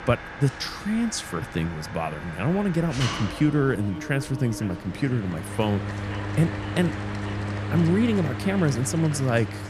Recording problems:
echo of what is said; faint; from 2.5 s on; 500 ms later, 20 dB below the speech
machinery noise; loud; throughout; 7 dB below the speech

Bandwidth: 14 kHz